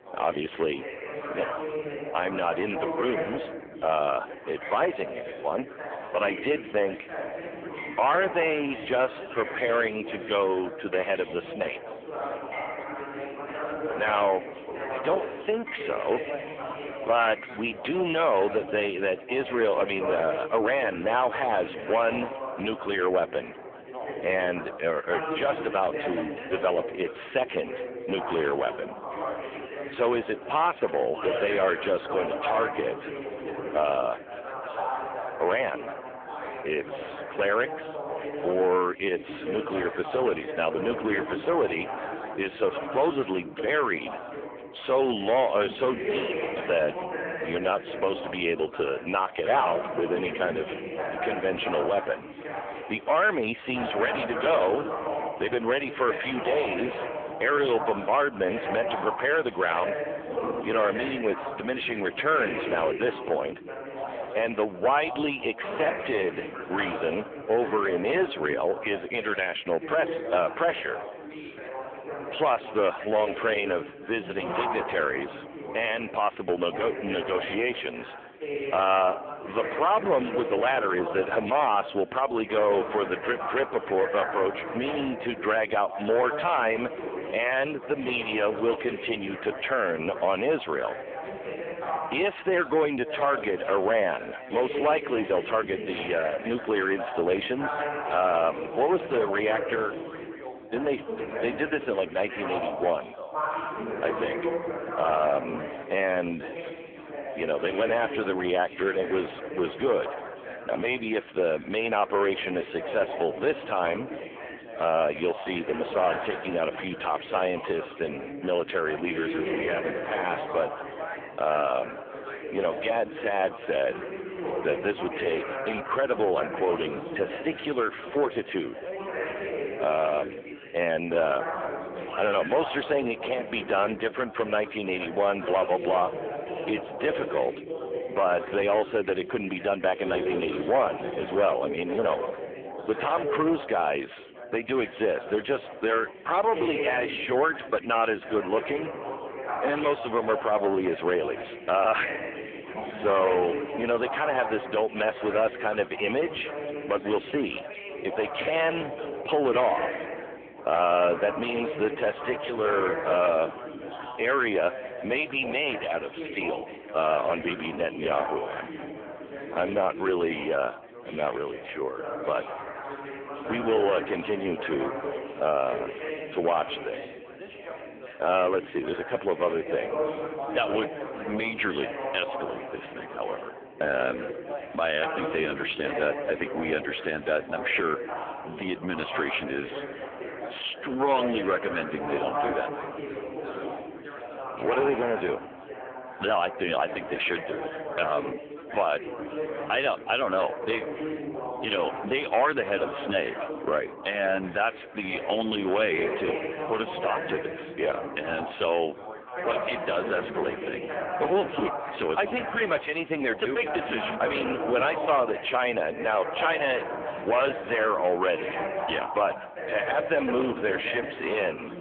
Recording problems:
phone-call audio; poor line; nothing above 3.5 kHz
distortion; slight; 6% of the sound clipped
background chatter; loud; throughout; 4 voices, 7 dB below the speech
household noises; faint; throughout; 25 dB below the speech

